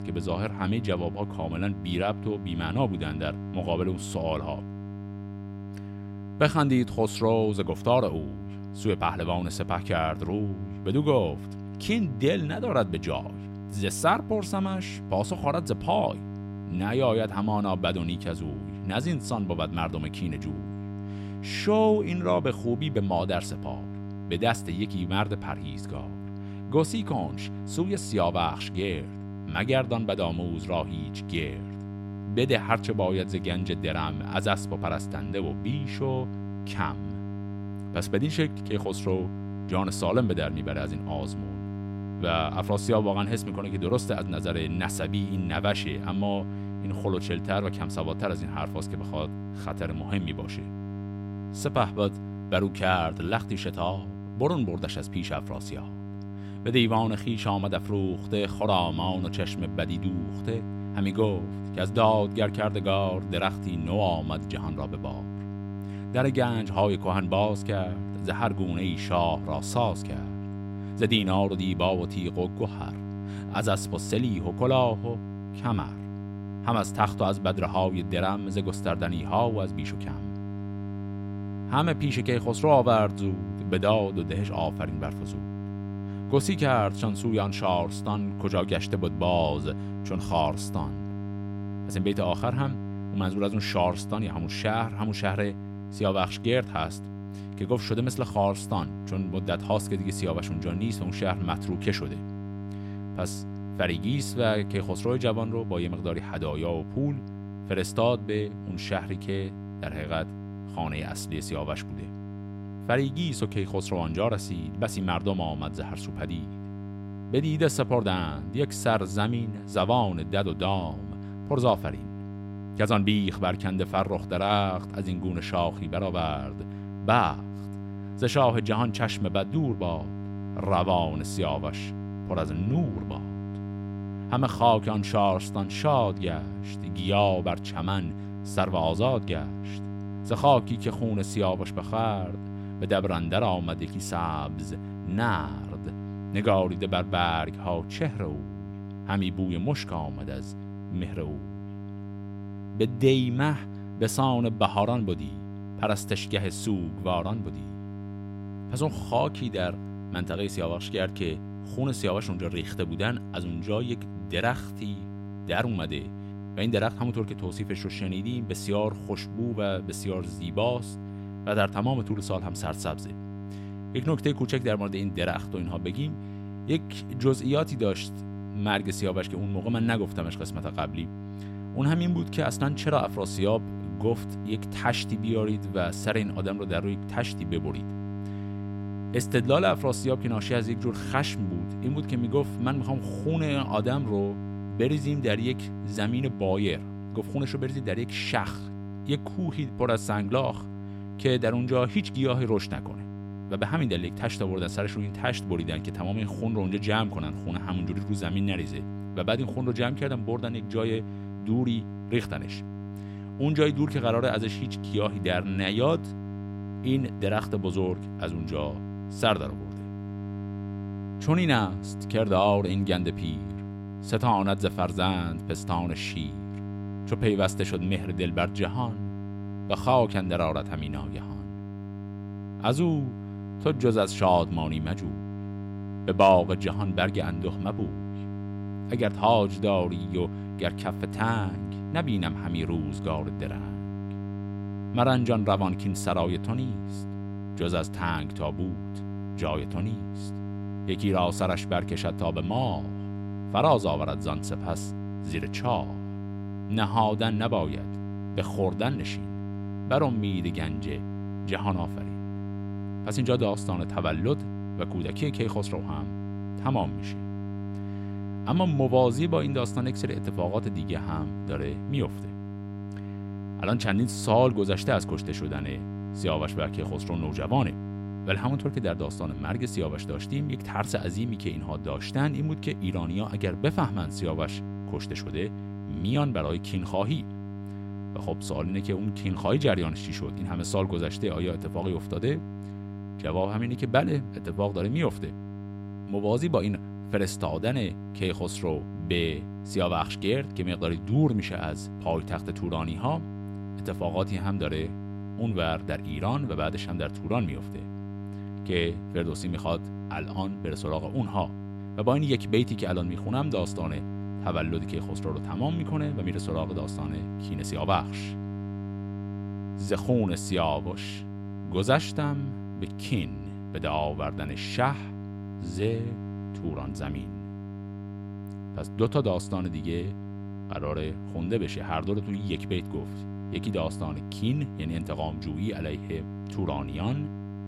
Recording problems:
electrical hum; noticeable; throughout; 50 Hz, 15 dB below the speech

